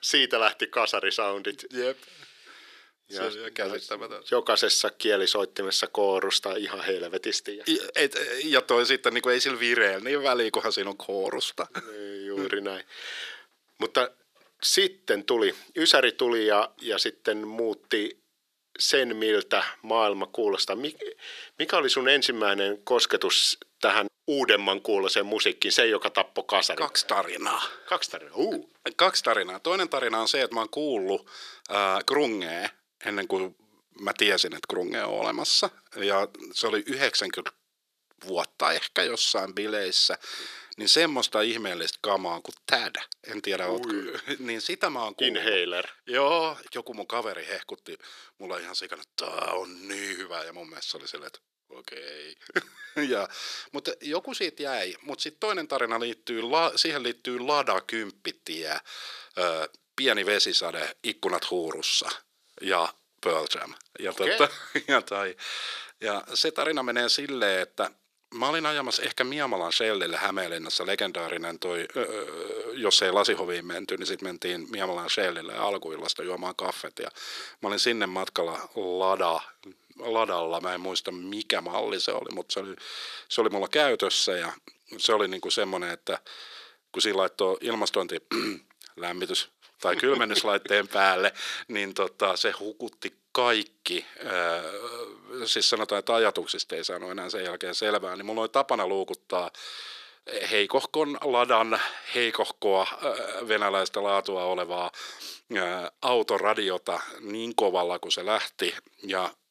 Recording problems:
thin; very; fading below 350 Hz

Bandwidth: 14.5 kHz